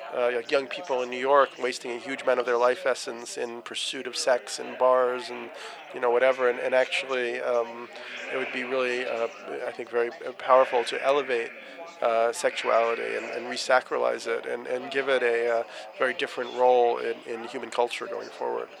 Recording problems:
thin; very; fading below 650 Hz
animal sounds; noticeable; throughout; 15 dB below the speech
background chatter; noticeable; throughout; 4 voices, 15 dB below the speech

